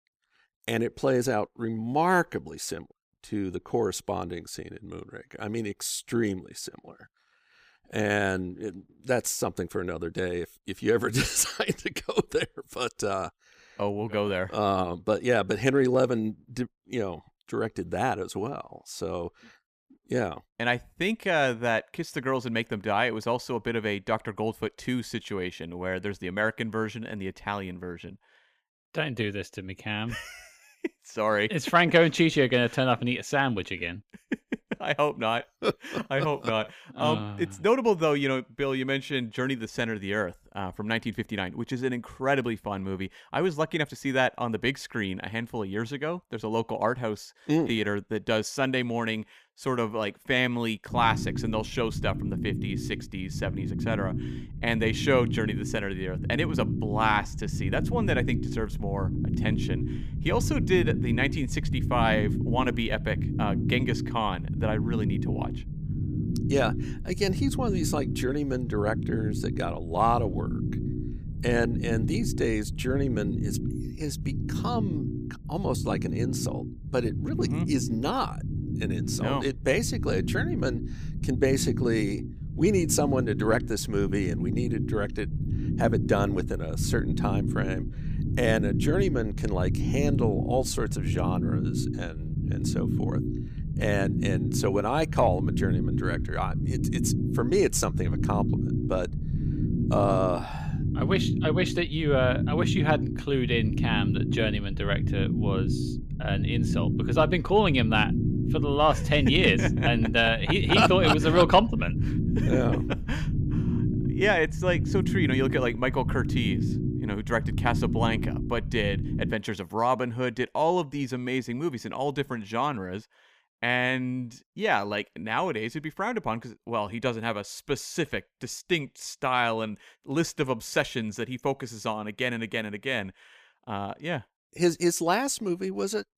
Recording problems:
low rumble; loud; from 51 s to 1:59; 10 dB below the speech

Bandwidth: 15 kHz